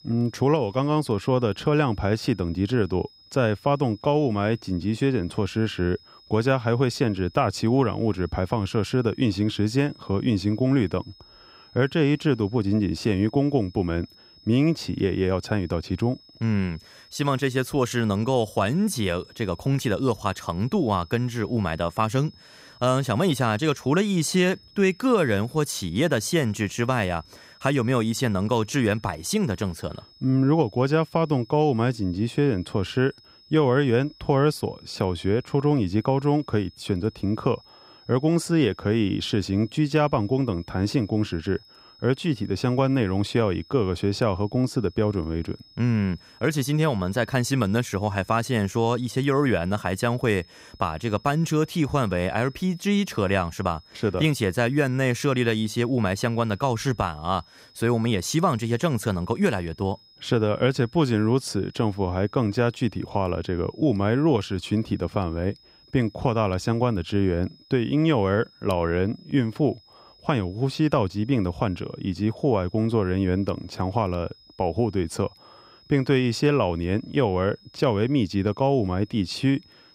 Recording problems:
high-pitched whine; faint; throughout; 5 kHz, 25 dB below the speech

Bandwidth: 15.5 kHz